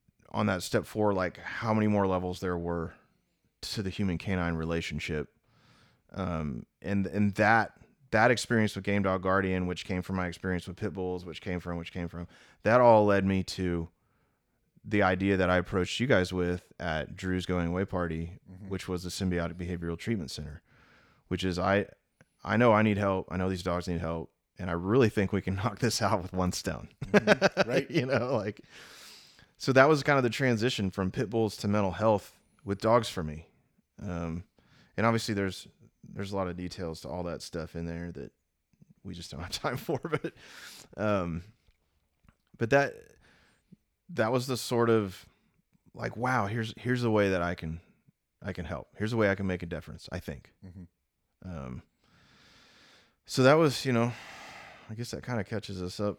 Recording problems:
none

